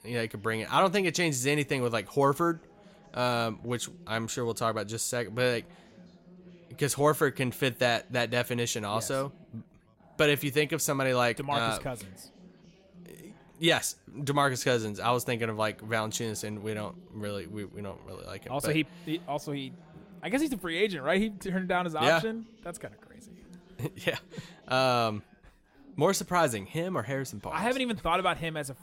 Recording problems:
background chatter; faint; throughout; 4 voices, 25 dB below the speech

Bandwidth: 16 kHz